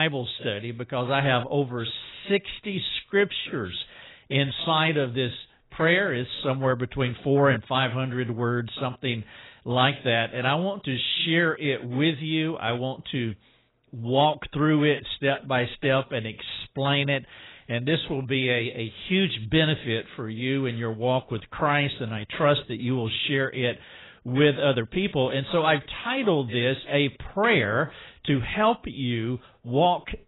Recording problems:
garbled, watery; badly; nothing above 4 kHz
abrupt cut into speech; at the start

